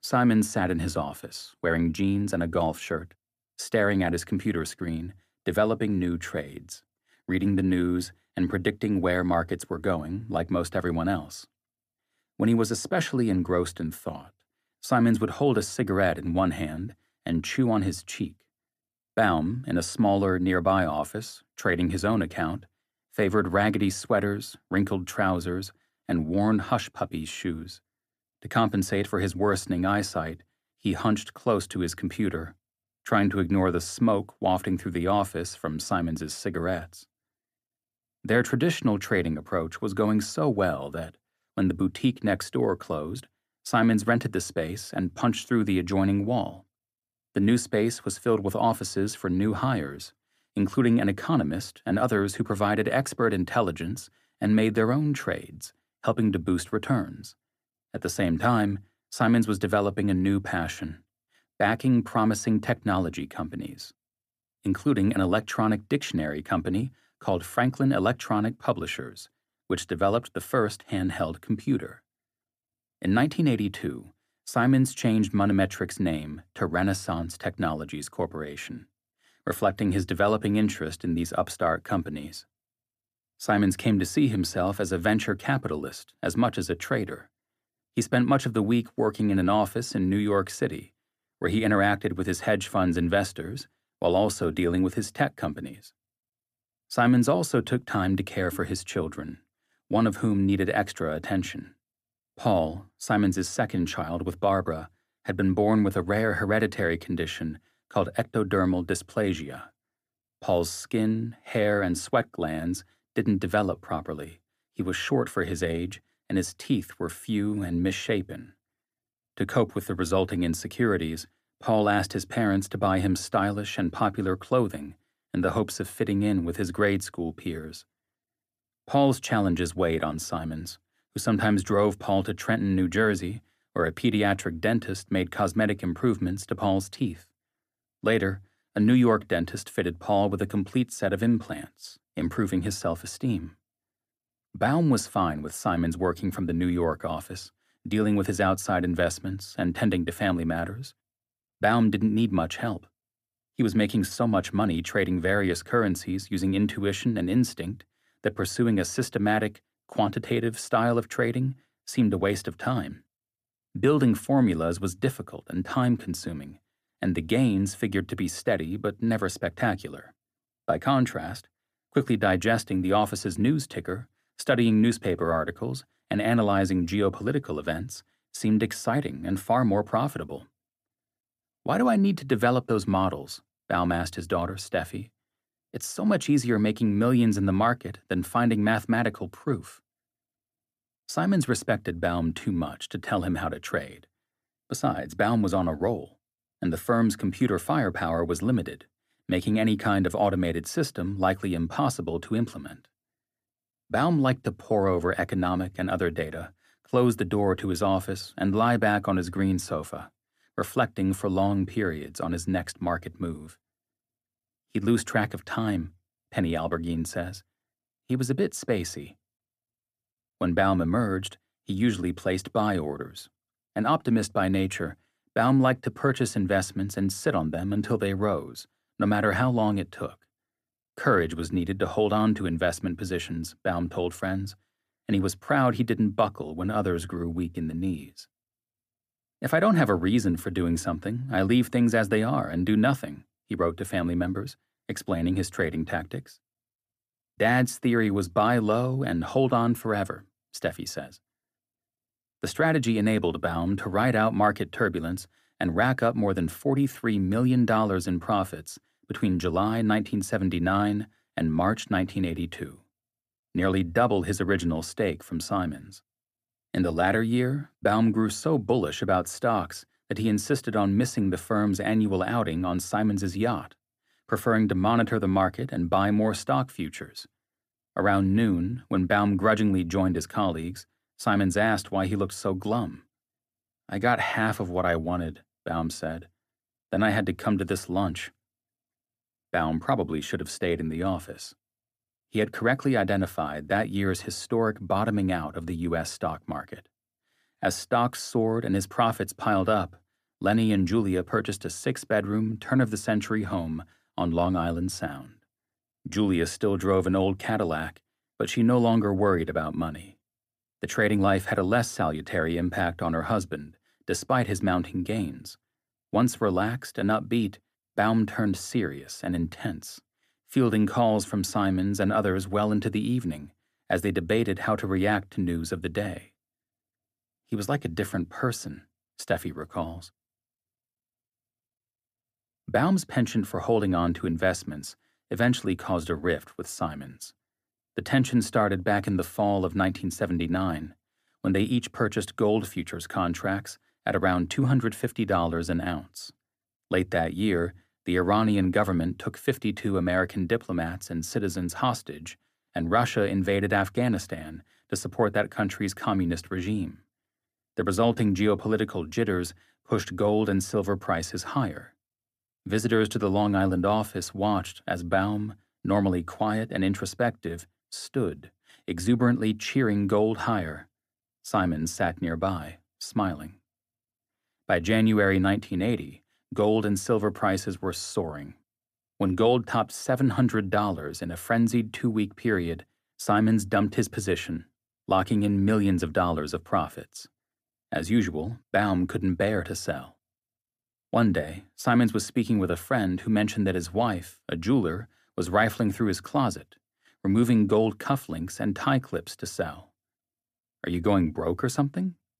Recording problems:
none

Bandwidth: 15 kHz